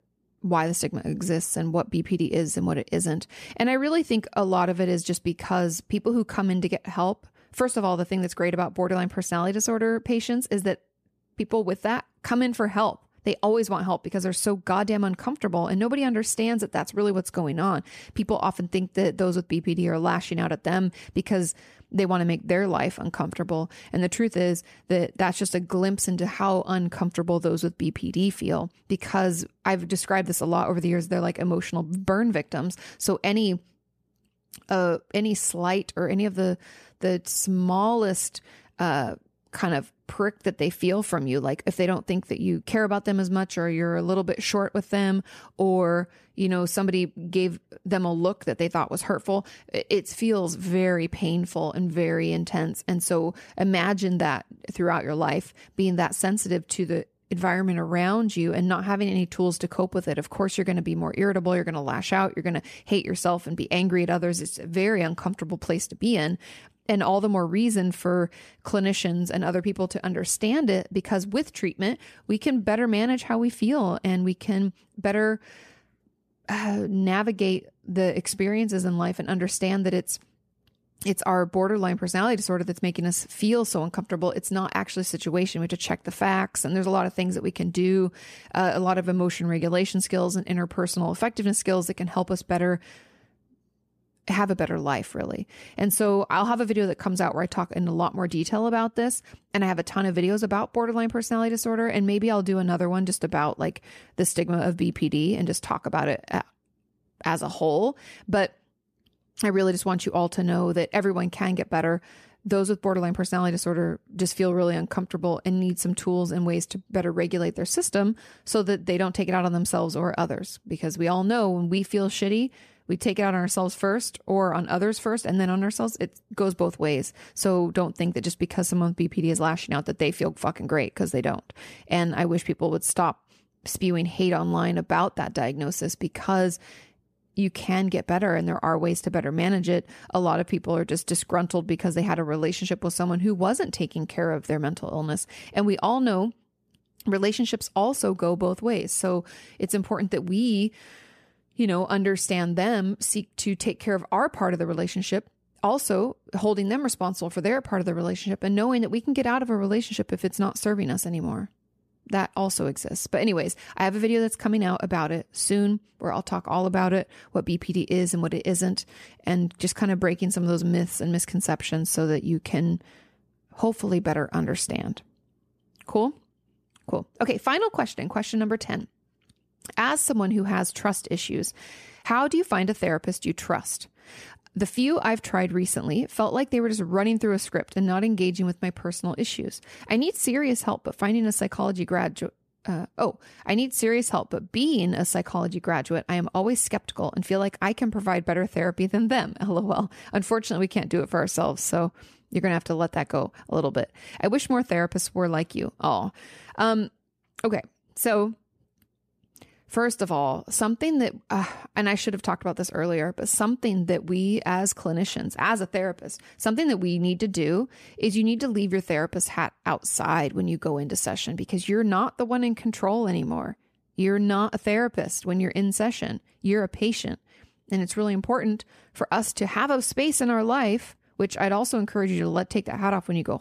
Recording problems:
none

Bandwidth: 14.5 kHz